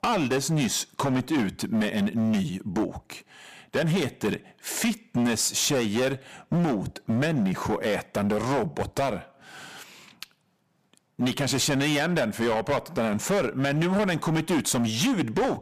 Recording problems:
distortion; heavy; 15% of the sound clipped

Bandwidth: 15 kHz